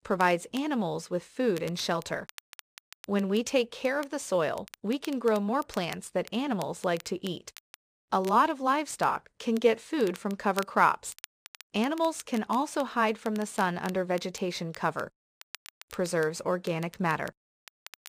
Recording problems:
crackle, like an old record; faint; 20 dB below the speech

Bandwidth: 15 kHz